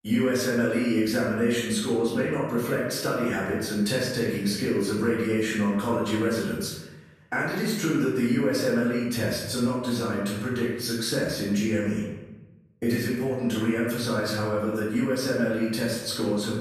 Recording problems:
off-mic speech; far
room echo; noticeable; dies away in 1 s

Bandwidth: 14 kHz